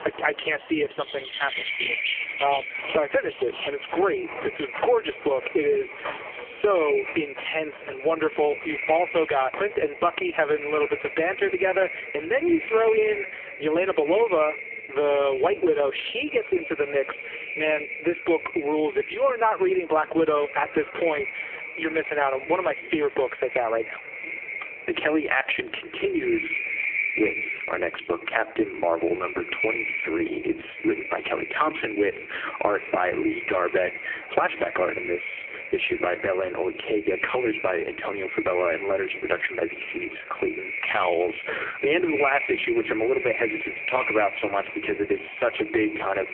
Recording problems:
phone-call audio; poor line; nothing above 3 kHz
echo of what is said; strong; throughout; 390 ms later, 7 dB below the speech
squashed, flat; heavily, background pumping
animal sounds; noticeable; until 11 s; 10 dB below the speech

